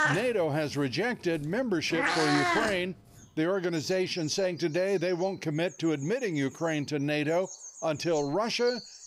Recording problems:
animal sounds; loud; throughout; 4 dB below the speech

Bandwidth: 15.5 kHz